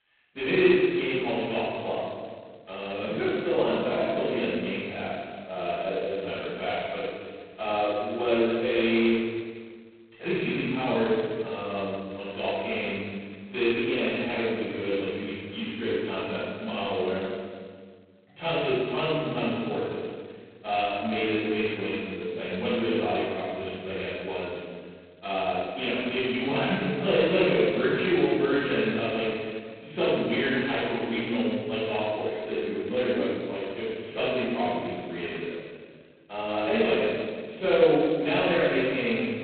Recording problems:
phone-call audio; poor line; nothing above 4 kHz
room echo; strong; dies away in 1.7 s
off-mic speech; far

